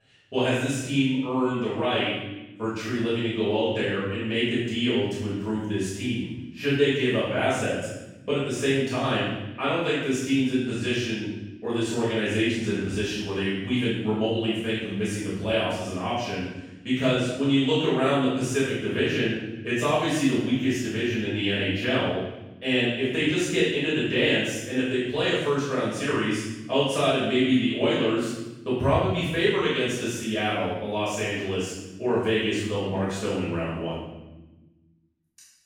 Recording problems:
room echo; strong; dies away in 1 s
off-mic speech; far

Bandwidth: 18.5 kHz